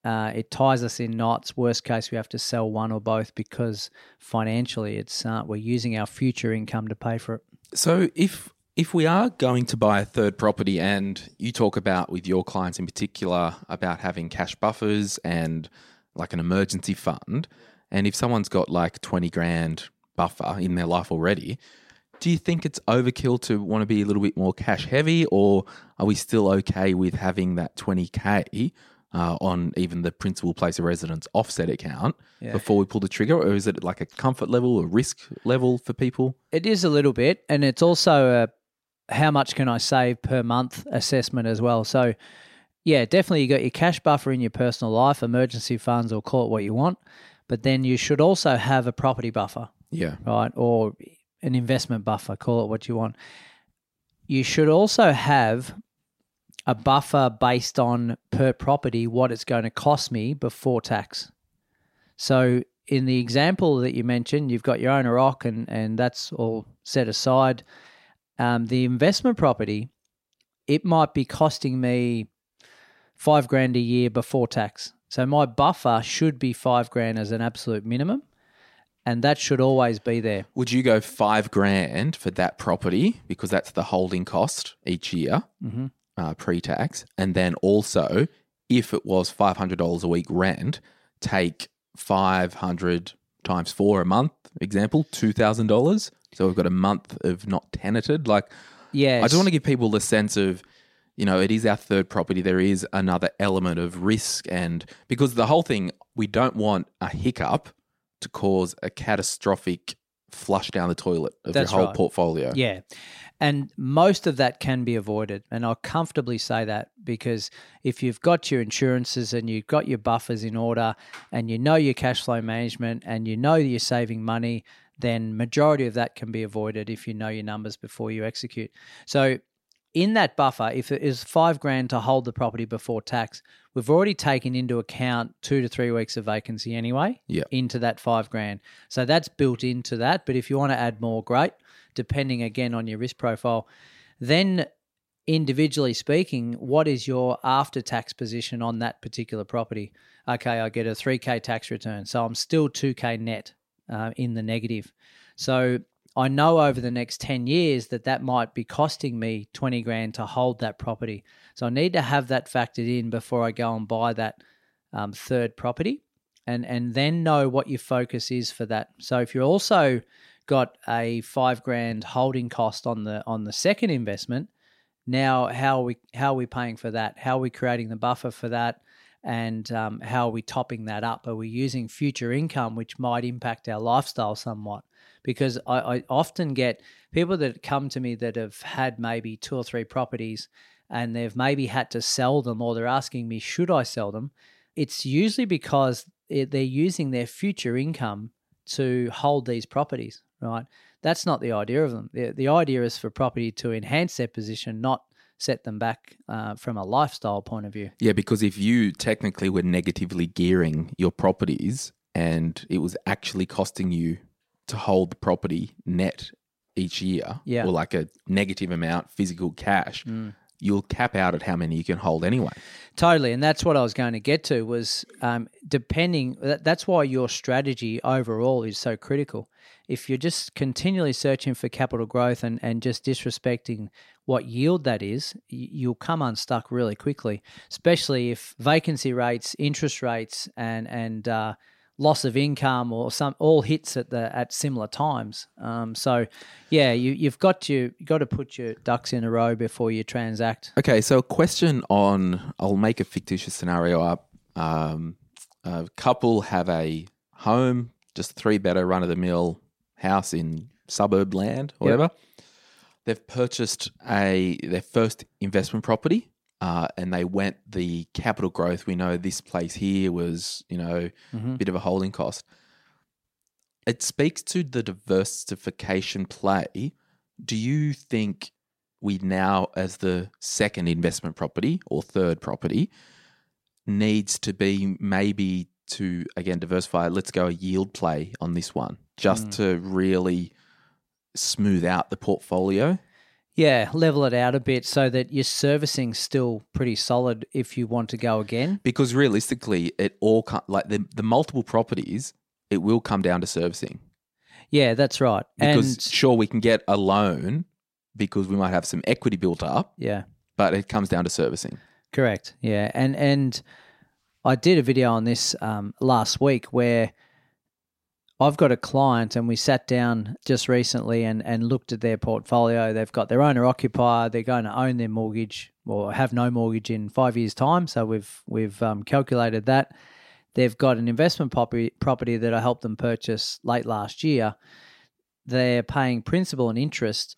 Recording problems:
none

